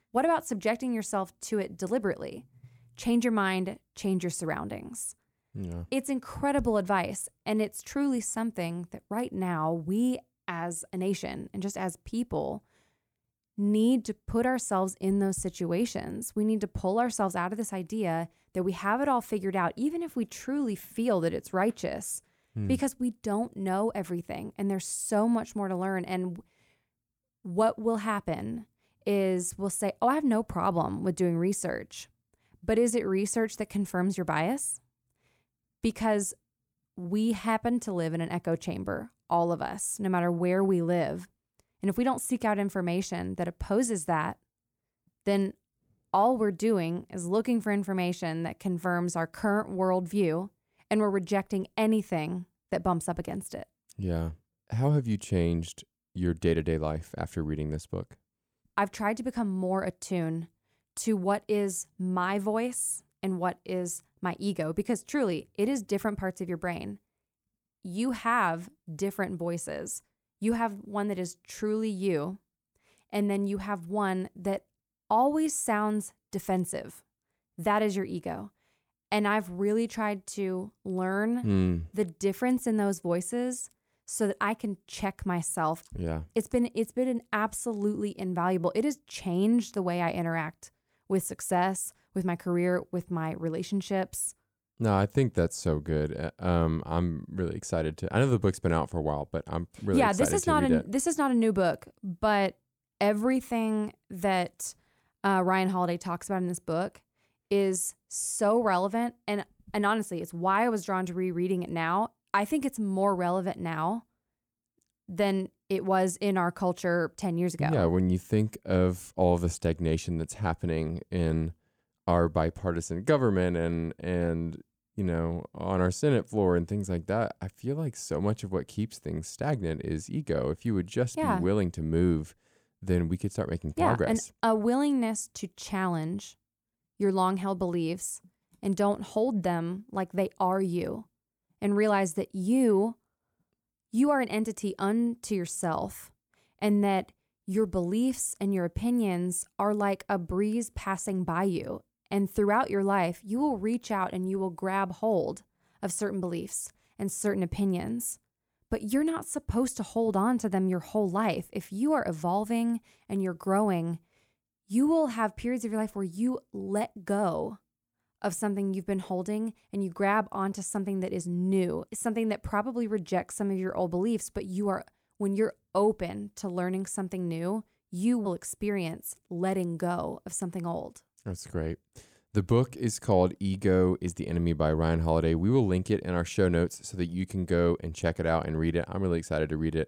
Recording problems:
none

